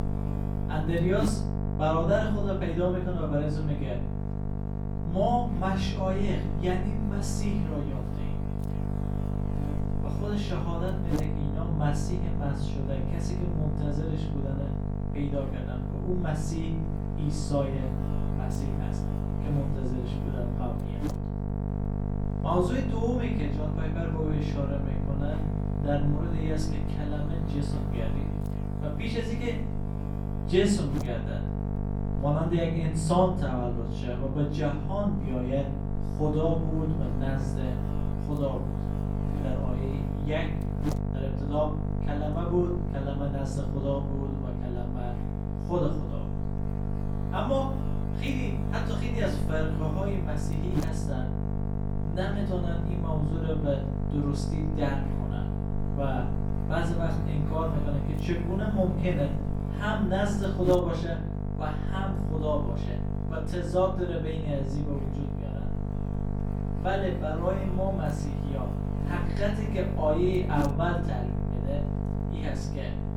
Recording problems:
off-mic speech; far
room echo; slight; dies away in 0.5 s
electrical hum; loud; throughout; 50 Hz, 6 dB below the speech

